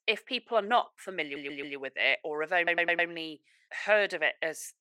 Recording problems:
thin; very; fading below 550 Hz
audio stuttering; at 1 s and at 2.5 s

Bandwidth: 16.5 kHz